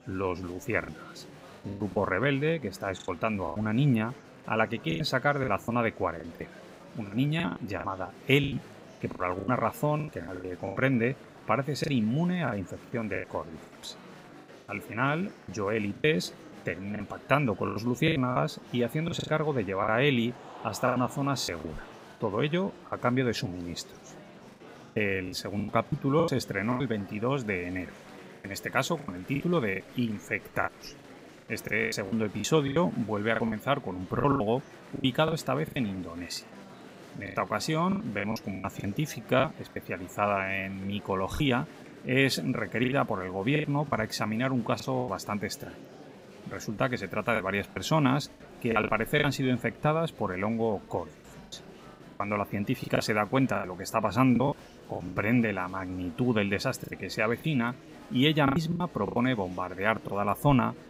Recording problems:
murmuring crowd; noticeable; throughout; 20 dB below the speech
choppy; very; 11% of the speech affected

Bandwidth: 15.5 kHz